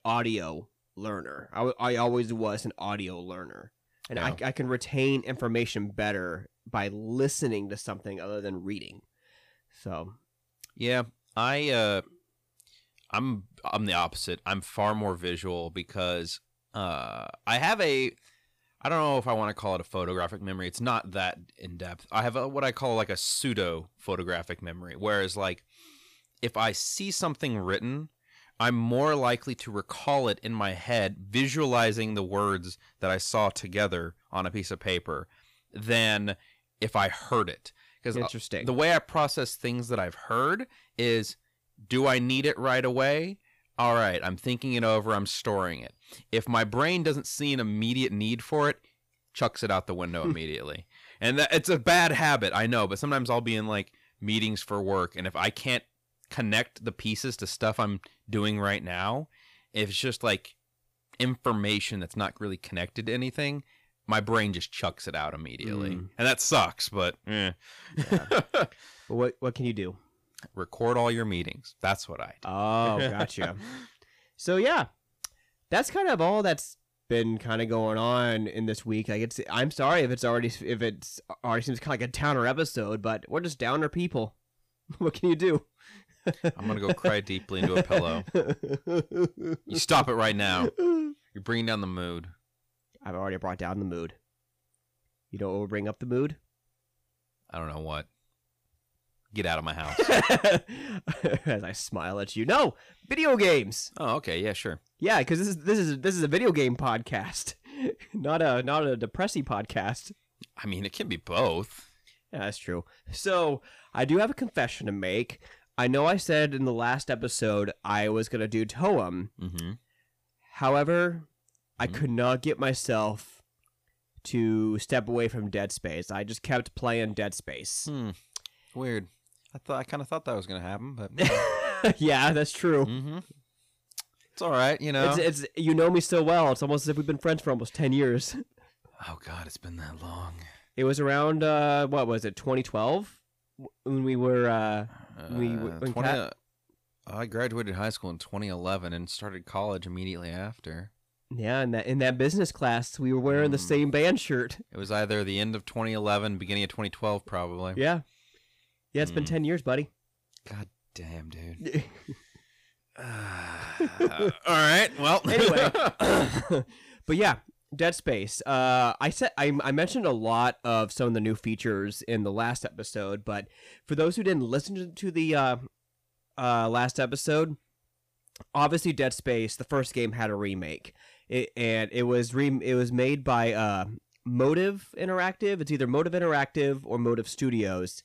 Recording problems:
distortion; slight; 10 dB below the speech

